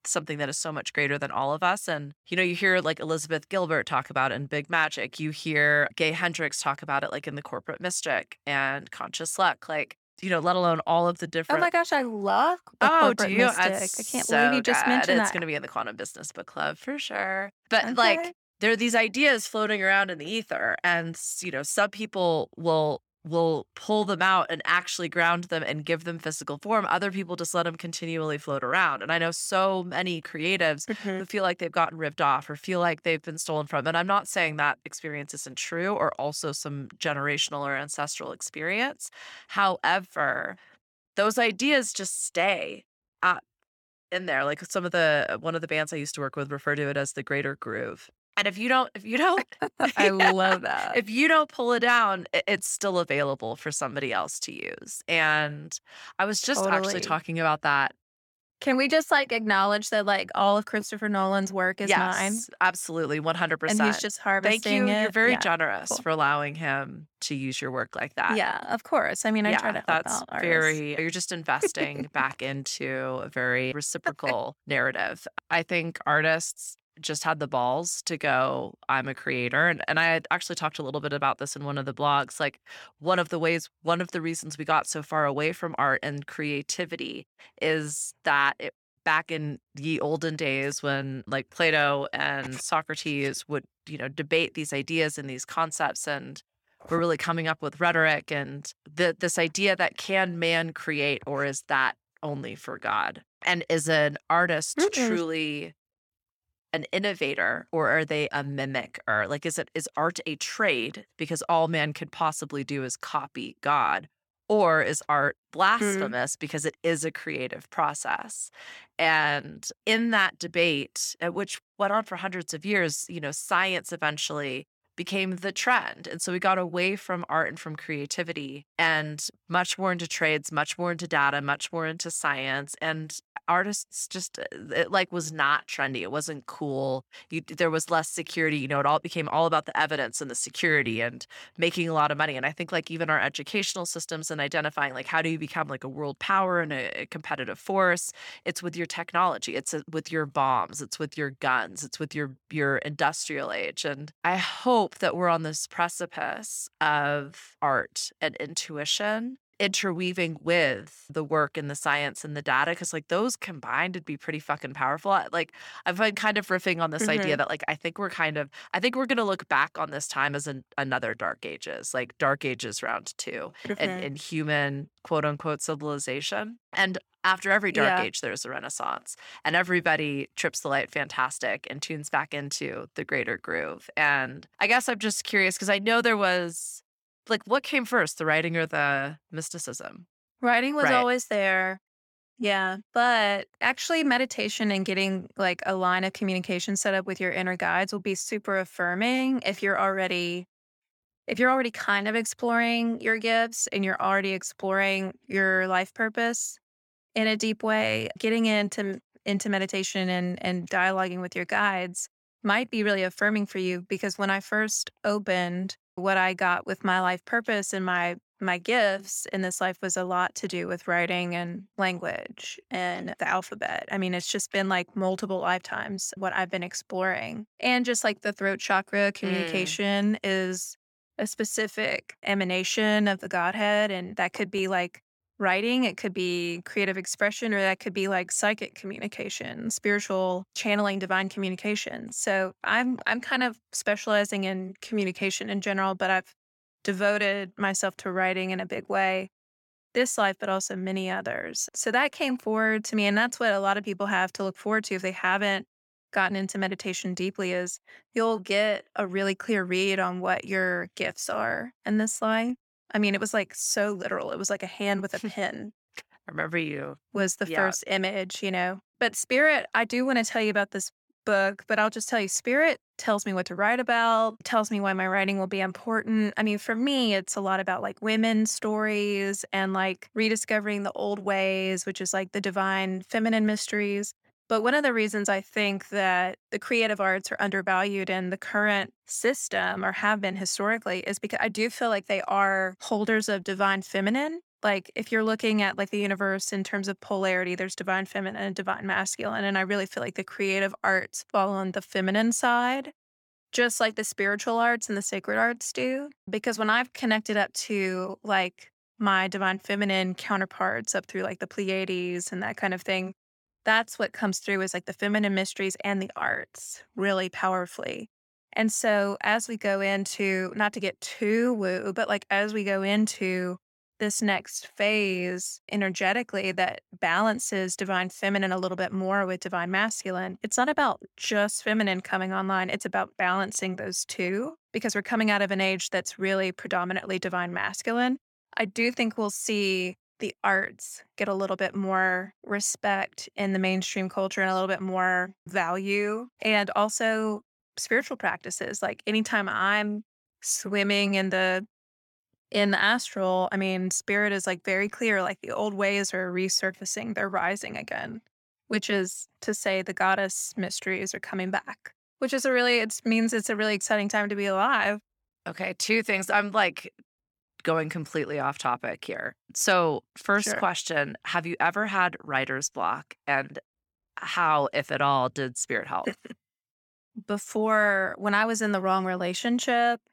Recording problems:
none

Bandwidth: 17 kHz